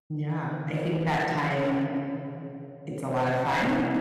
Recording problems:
room echo; strong; dies away in 2.9 s
distortion; slight; 9% of the sound clipped
off-mic speech; somewhat distant

